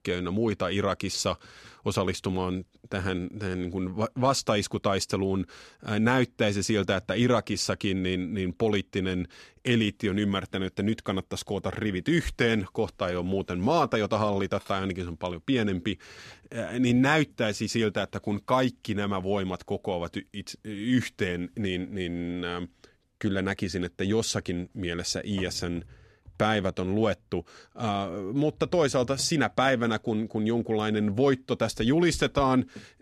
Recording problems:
none

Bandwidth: 13.5 kHz